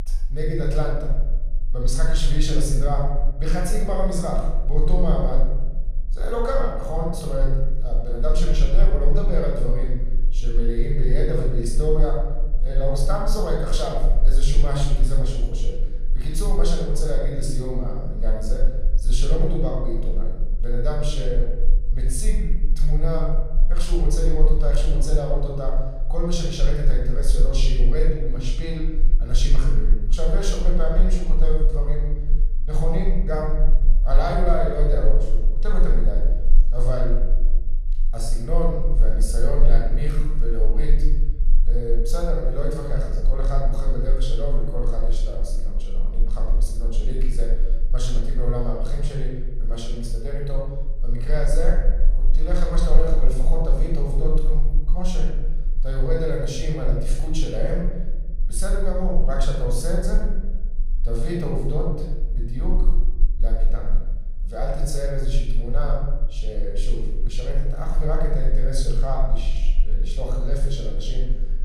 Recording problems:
room echo; noticeable; dies away in 1.1 s
off-mic speech; somewhat distant
low rumble; faint; throughout; 25 dB below the speech

